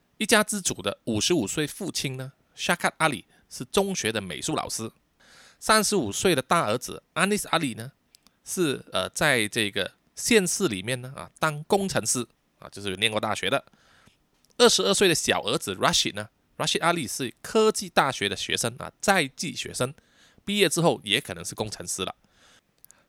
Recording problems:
none

